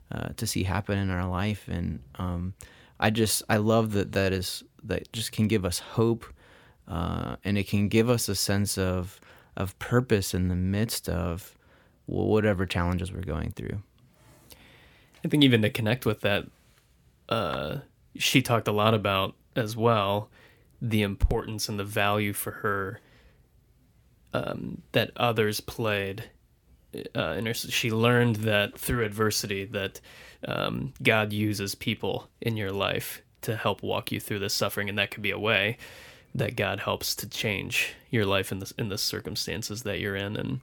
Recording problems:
none

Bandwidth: 18.5 kHz